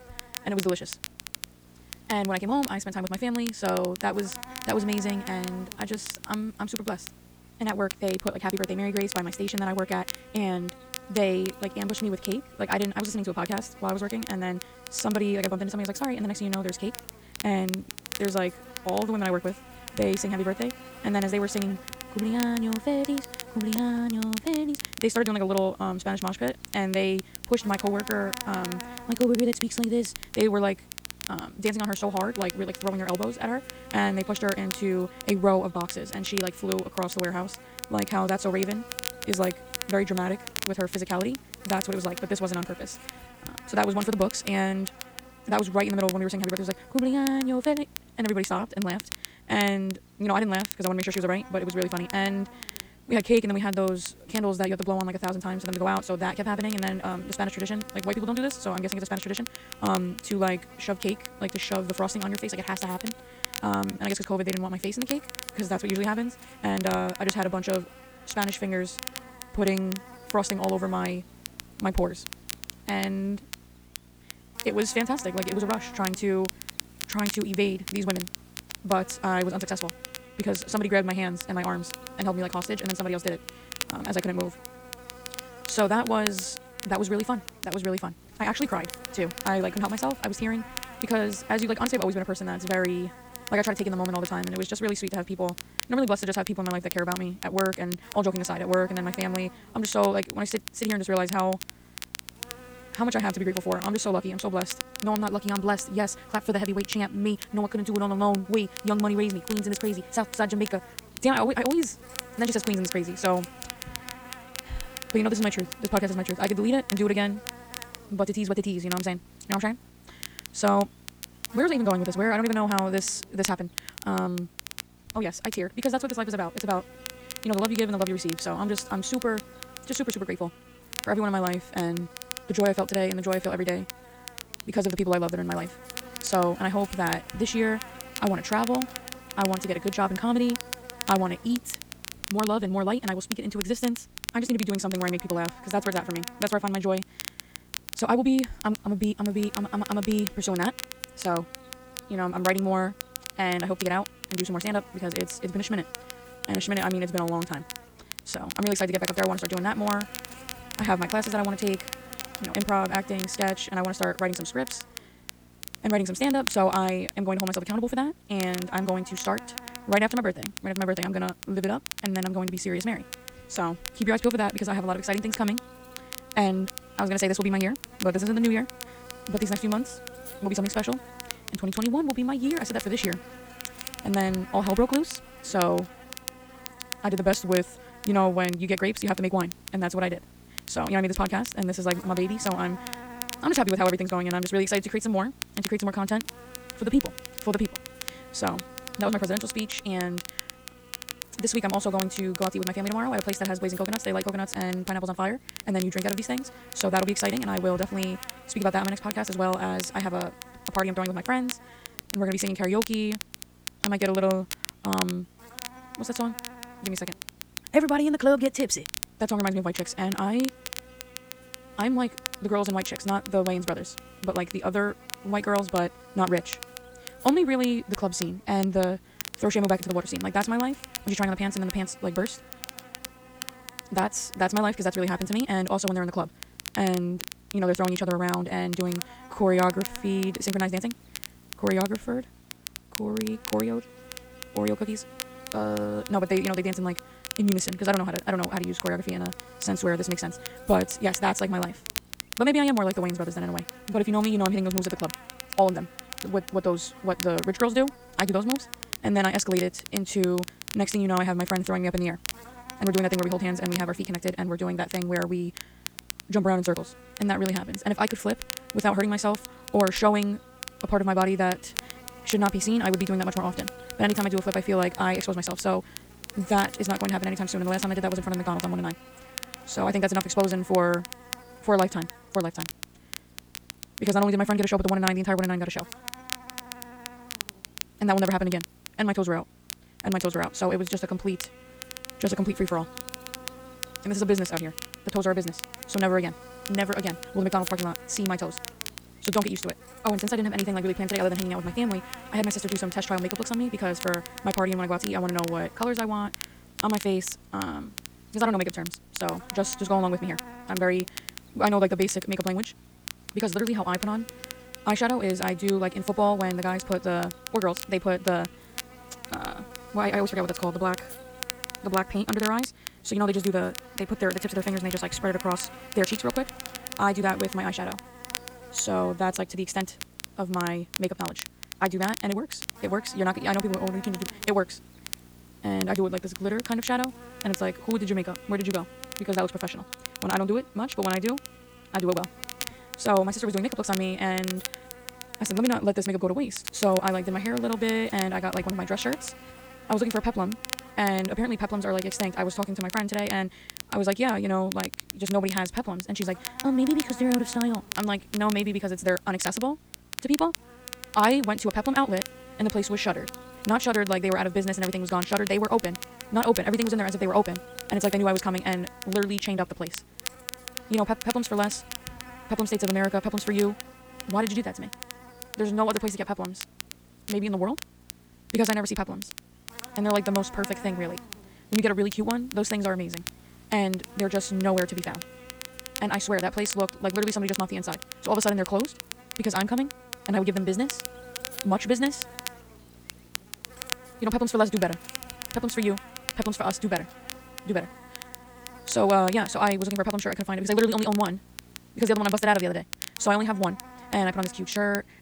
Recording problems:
wrong speed, natural pitch; too fast; 1.8 times normal speed
electrical hum; noticeable; throughout; 60 Hz, 20 dB below the speech
crackle, like an old record; noticeable; 10 dB below the speech

